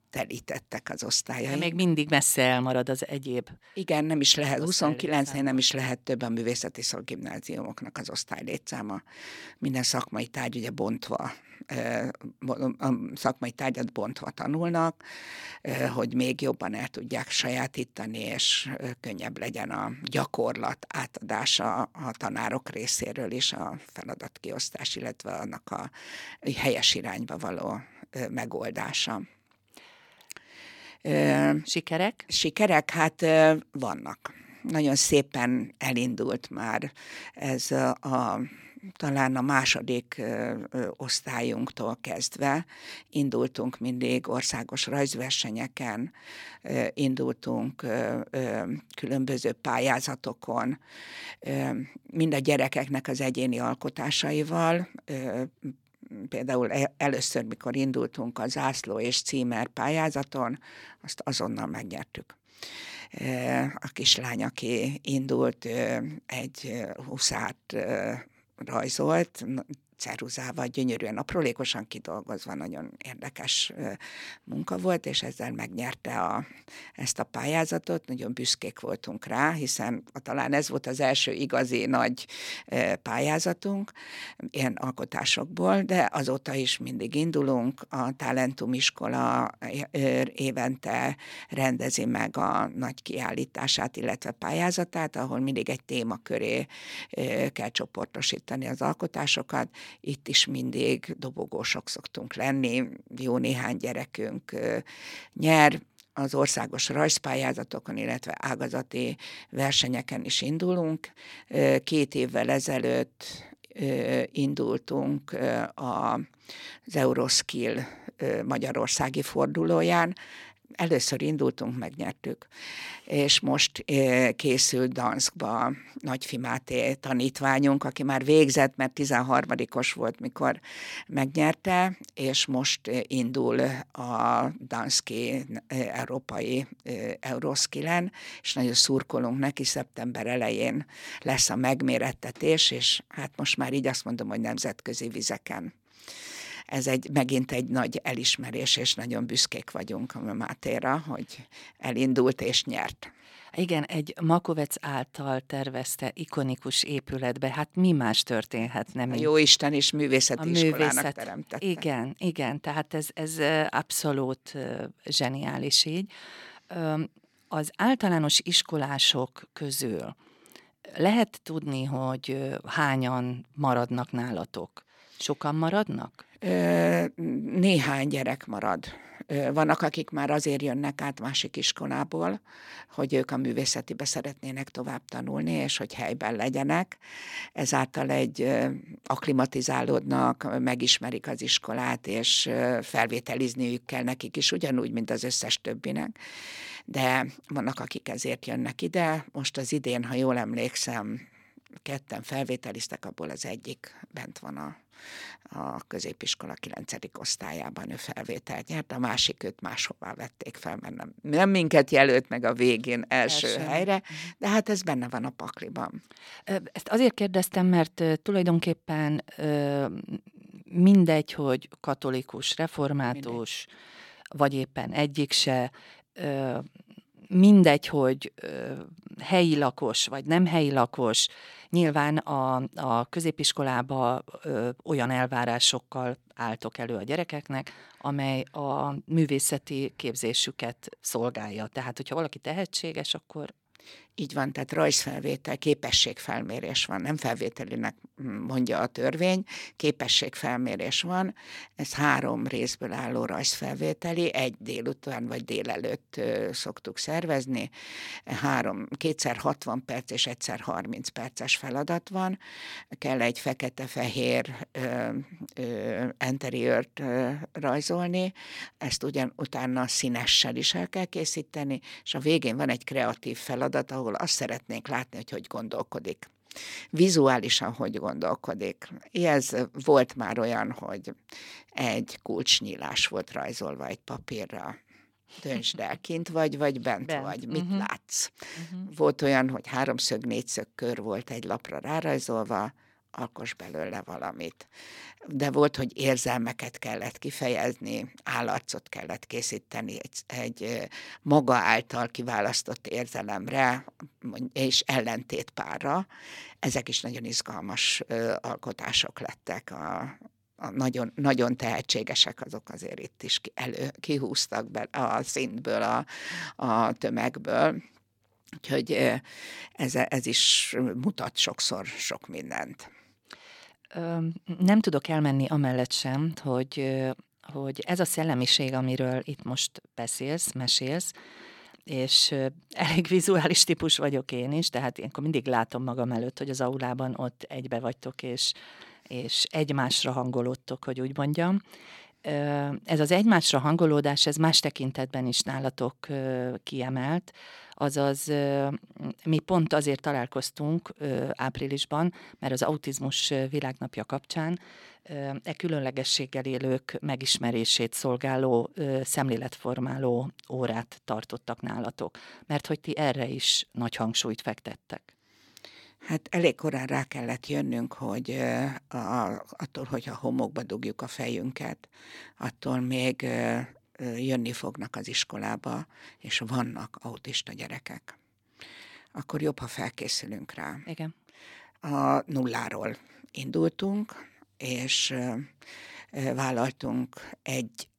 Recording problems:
none

